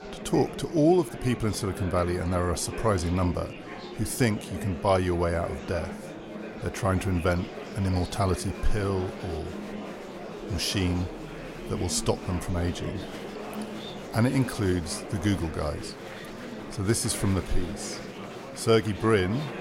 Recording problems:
murmuring crowd; noticeable; throughout; 10 dB below the speech

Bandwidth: 16 kHz